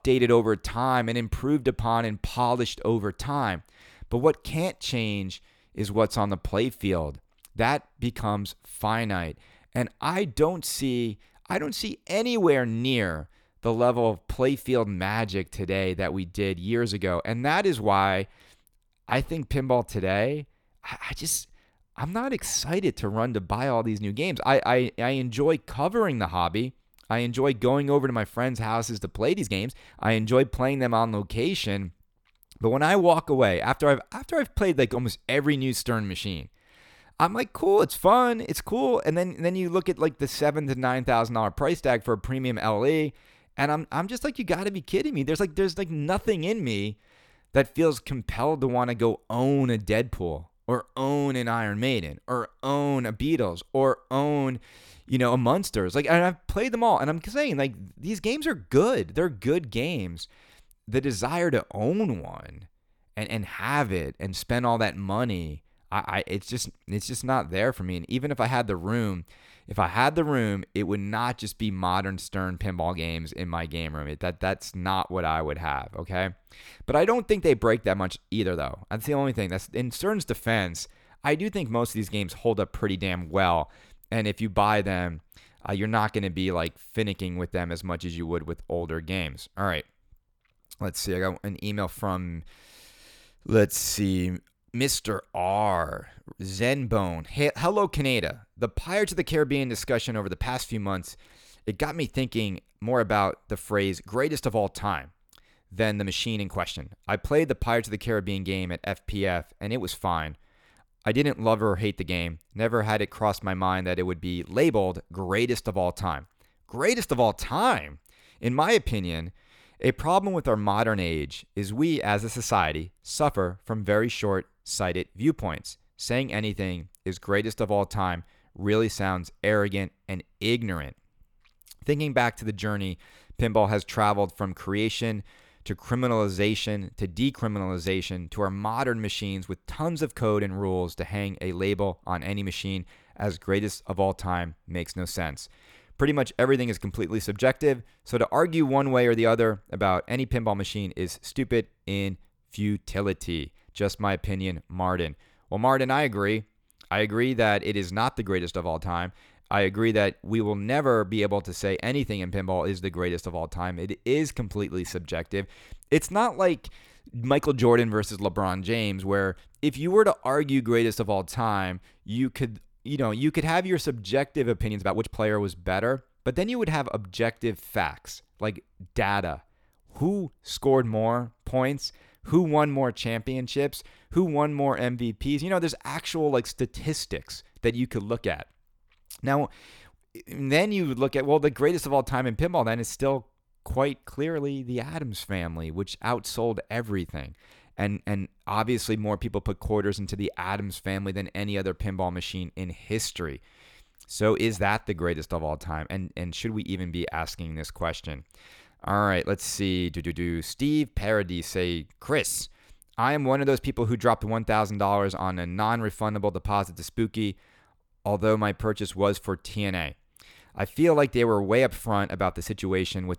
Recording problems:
uneven, jittery; strongly; from 29 s to 3:18

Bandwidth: 18.5 kHz